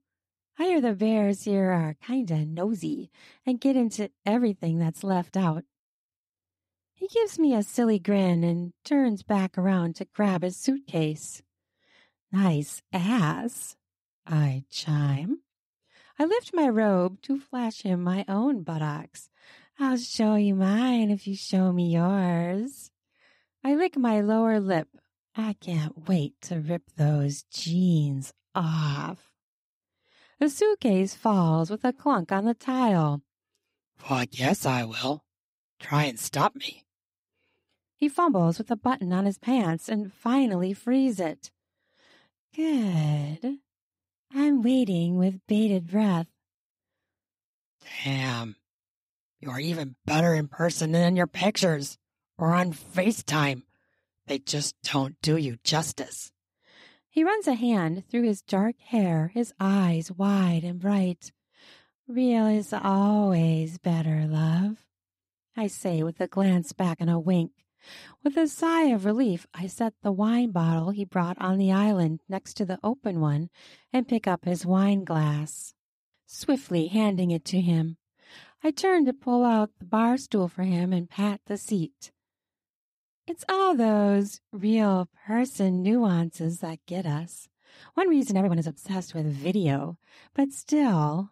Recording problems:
uneven, jittery; strongly; from 3.5 s to 1:29

